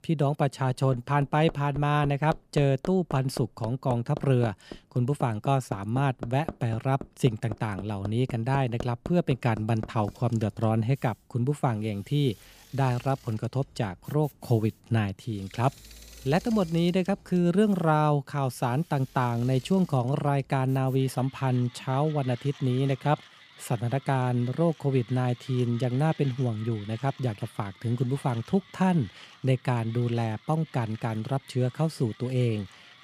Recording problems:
machinery noise; noticeable; throughout; 20 dB below the speech

